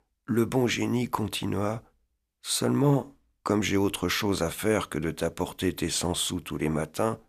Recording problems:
none

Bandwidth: 14.5 kHz